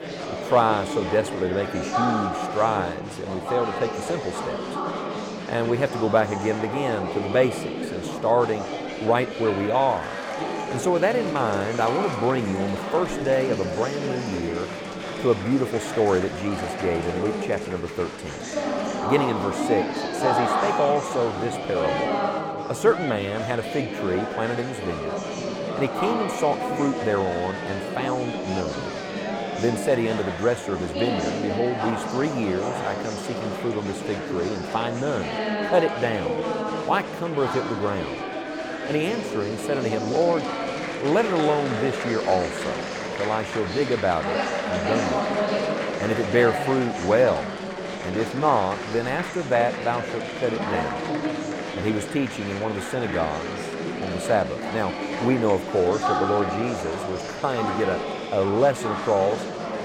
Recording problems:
murmuring crowd; loud; throughout; 3 dB below the speech

